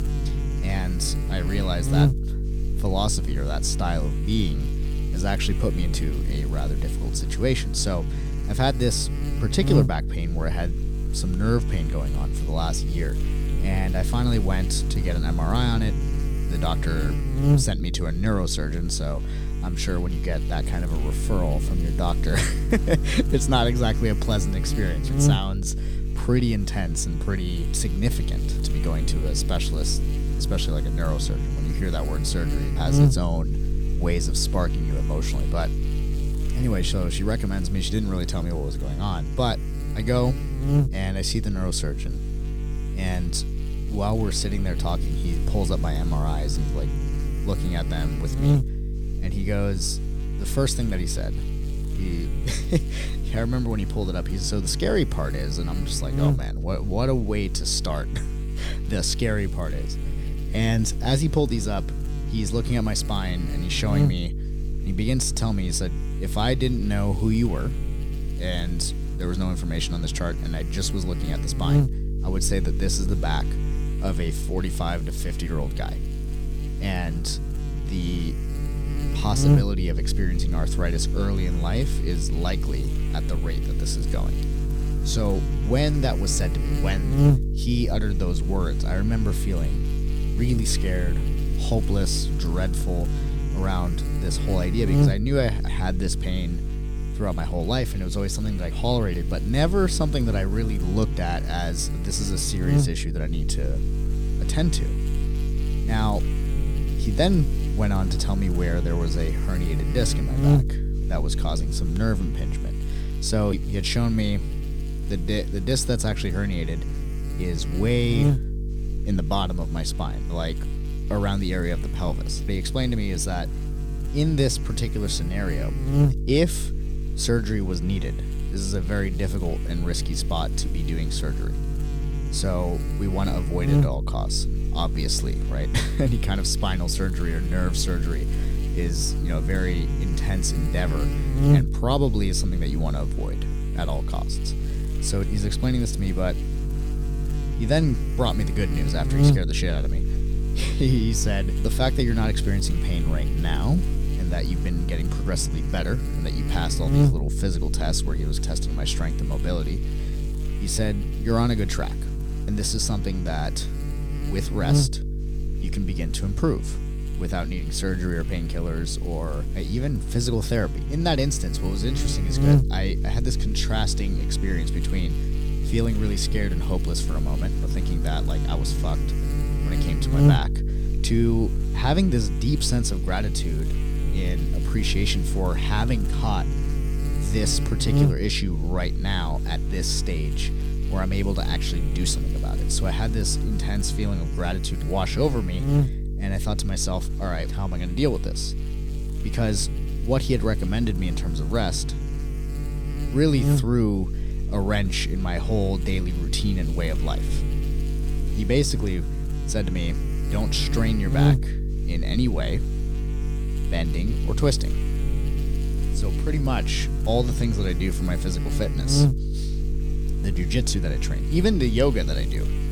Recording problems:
electrical hum; loud; throughout; 50 Hz, 7 dB below the speech

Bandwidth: 18.5 kHz